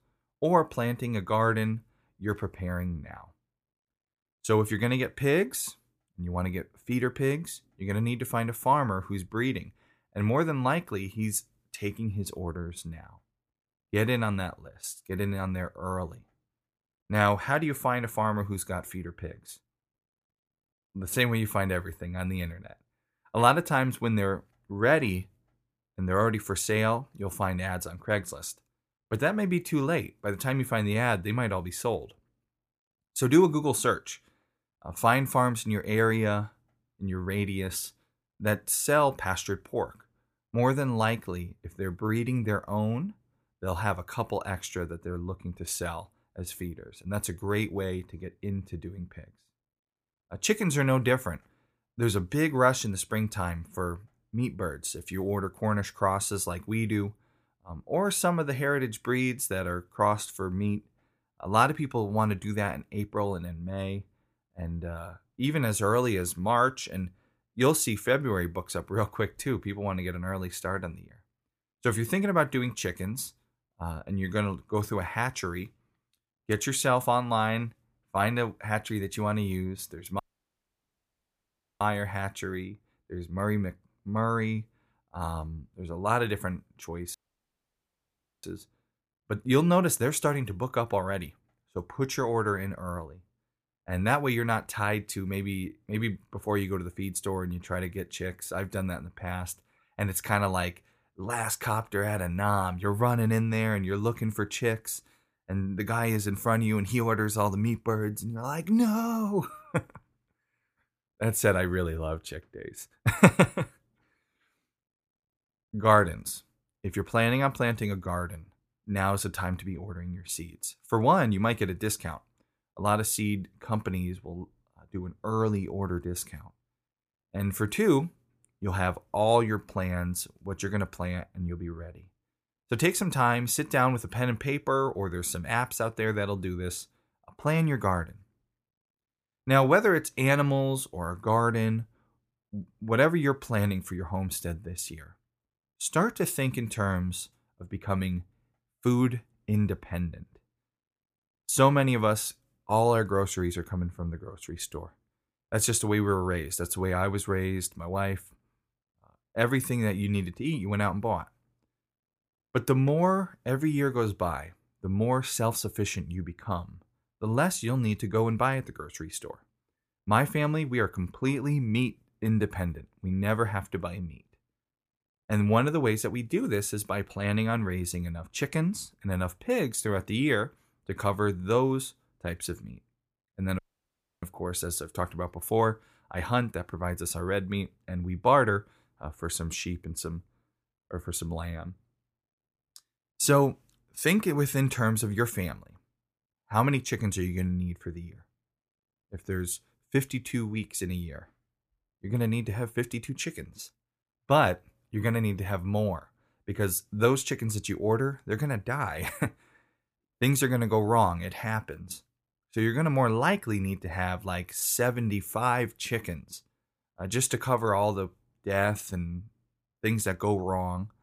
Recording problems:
audio cutting out; at 1:20 for 1.5 s, at 1:27 for 1.5 s and at 3:04 for 0.5 s

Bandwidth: 15 kHz